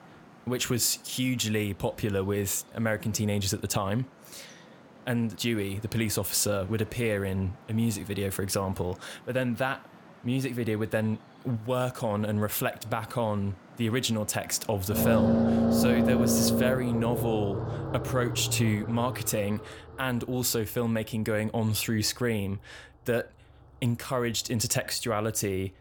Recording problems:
traffic noise; very loud; throughout; 1 dB above the speech

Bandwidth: 18 kHz